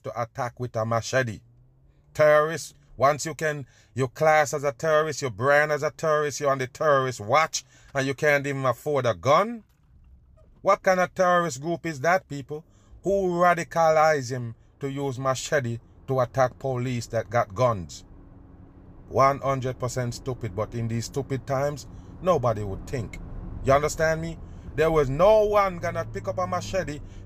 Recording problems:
traffic noise; faint; throughout; 20 dB below the speech

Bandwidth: 15 kHz